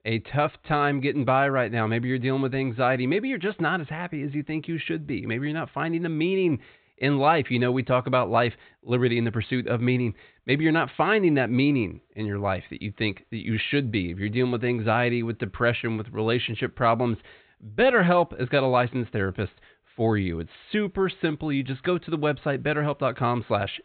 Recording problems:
high frequencies cut off; severe; nothing above 4 kHz

